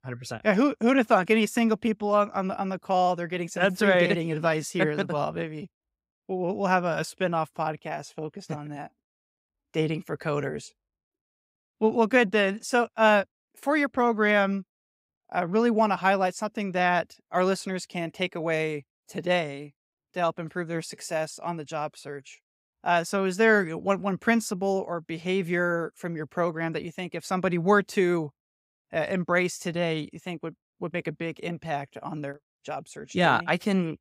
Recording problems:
none

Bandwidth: 15.5 kHz